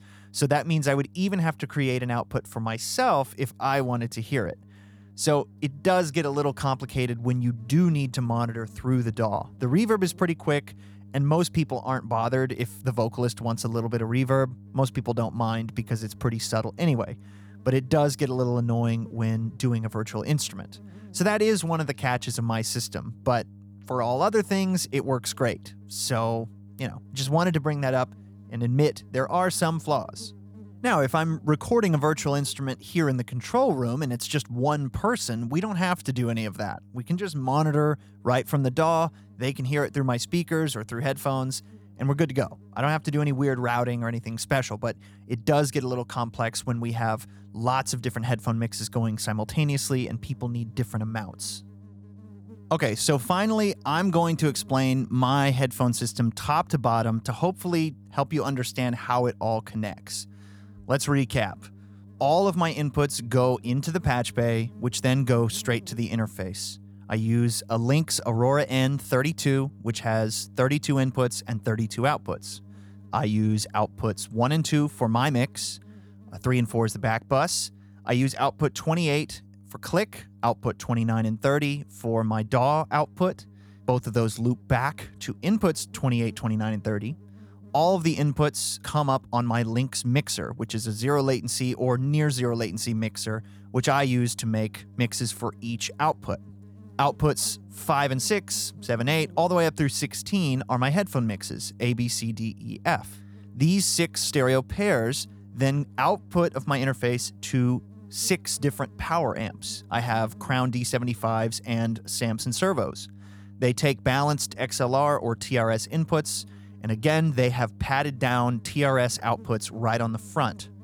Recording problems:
electrical hum; faint; throughout; 50 Hz, 30 dB below the speech

